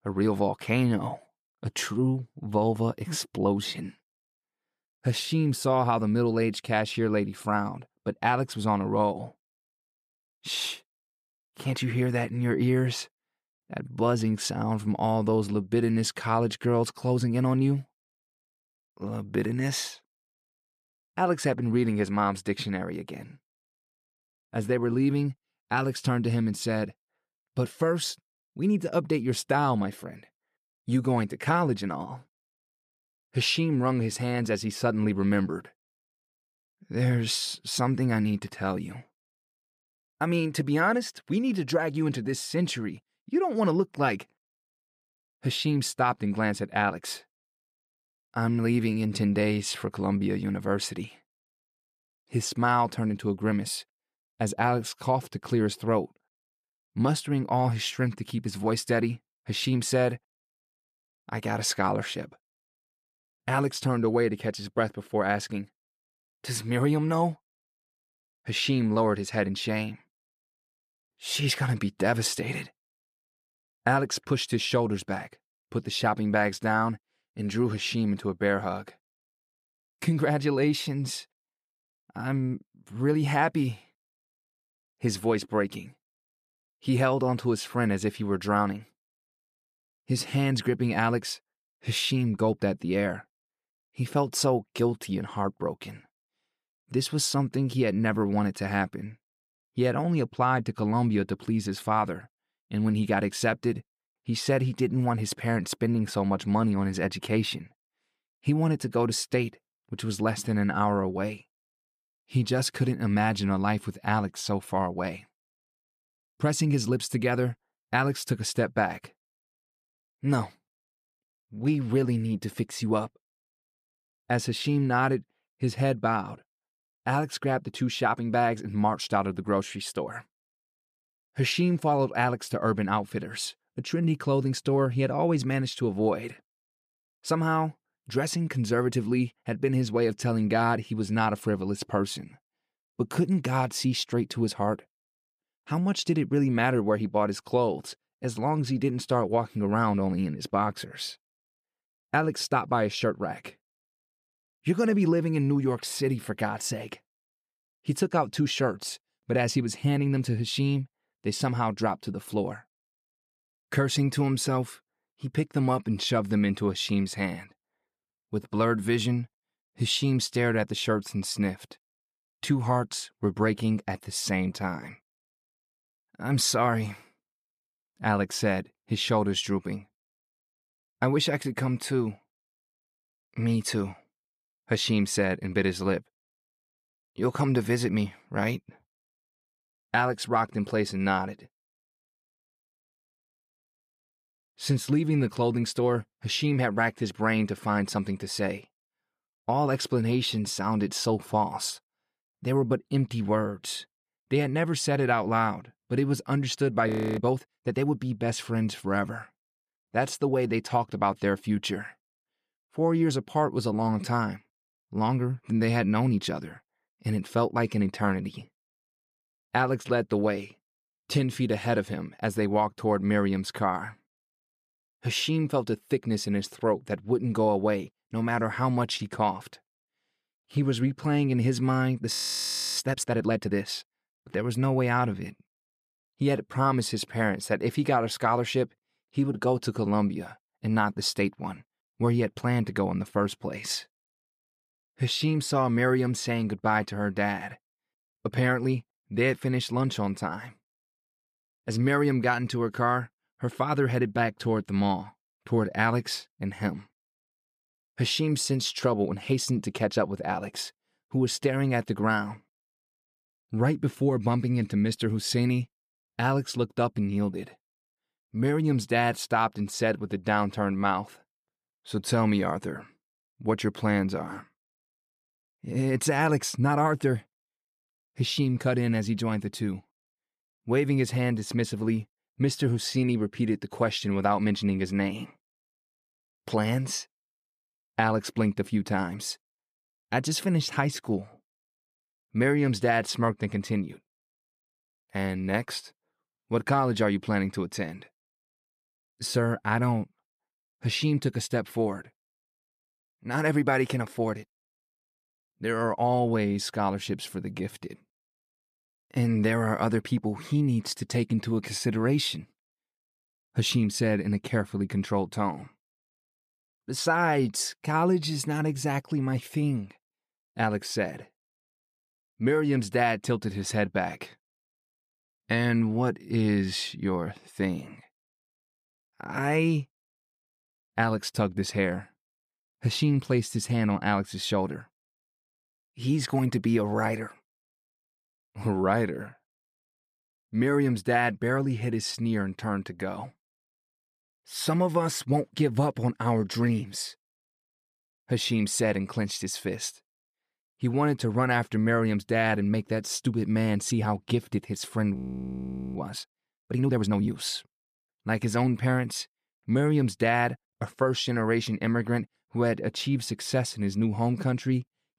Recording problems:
audio freezing; at 3:27, at 3:52 for 0.5 s and at 5:55 for 1 s

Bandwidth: 14.5 kHz